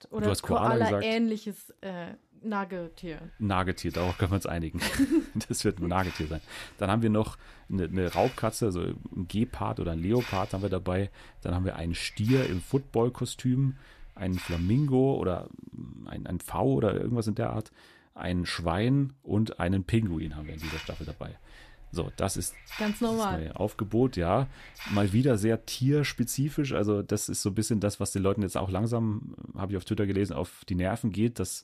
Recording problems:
hiss; noticeable; from 3 to 15 s and from 20 to 27 s; 15 dB below the speech

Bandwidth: 14.5 kHz